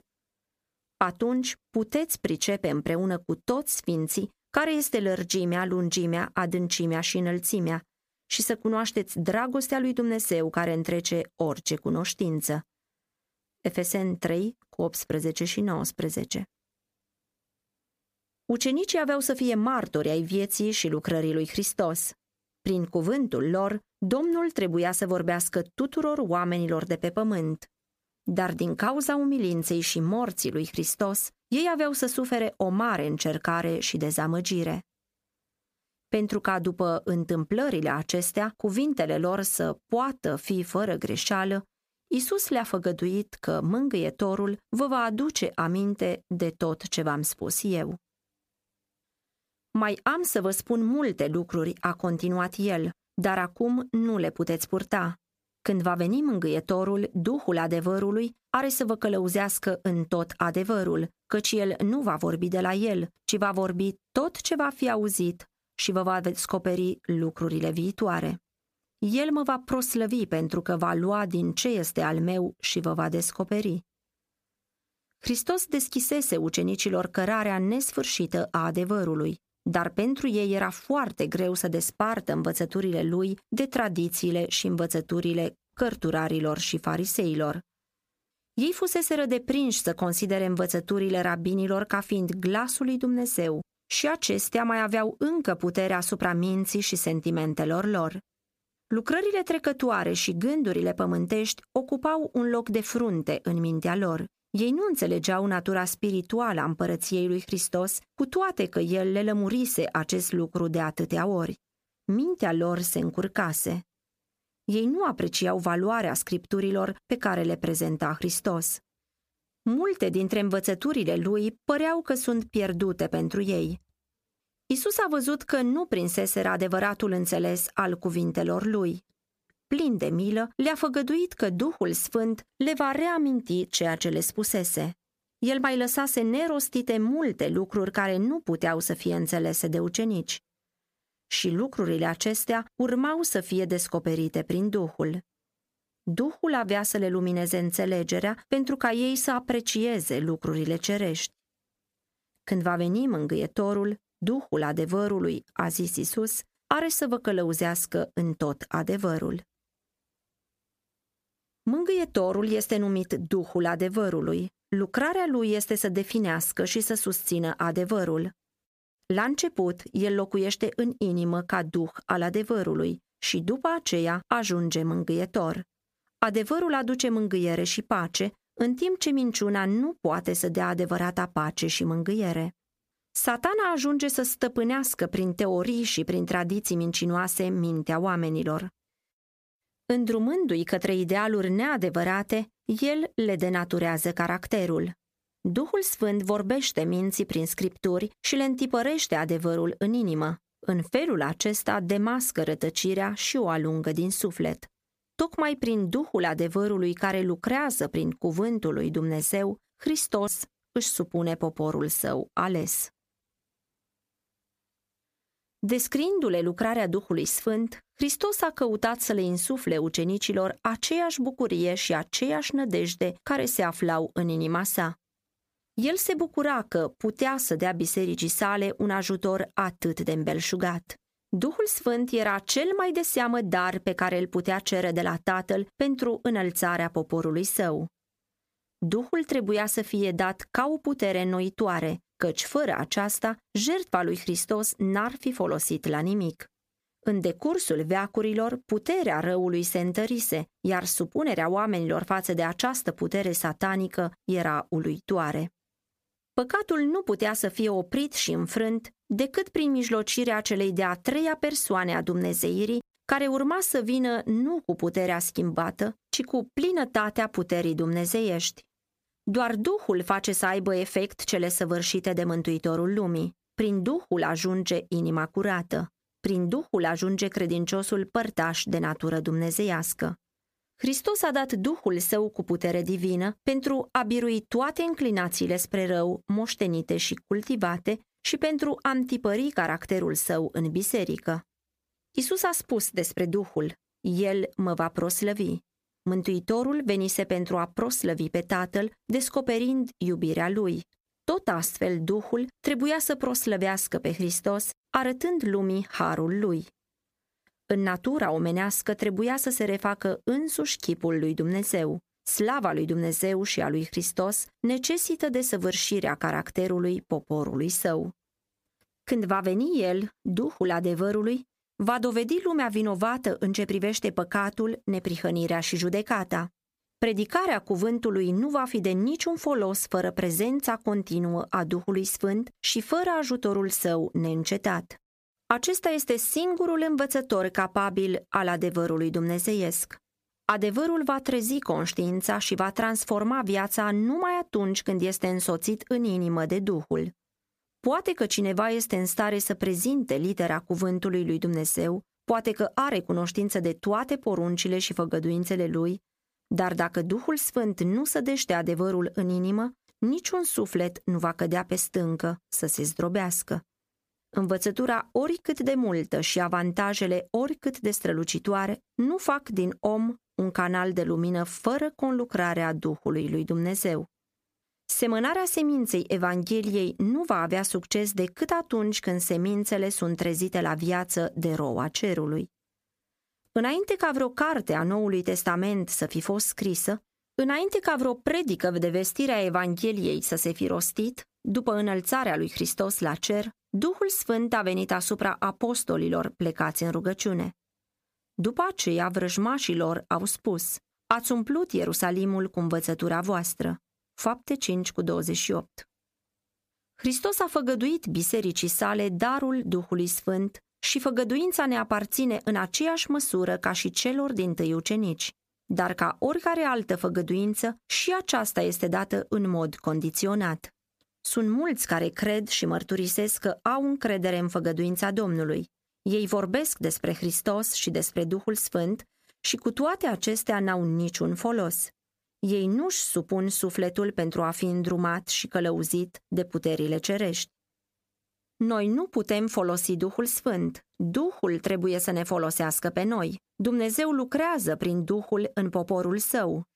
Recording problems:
squashed, flat; somewhat

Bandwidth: 15 kHz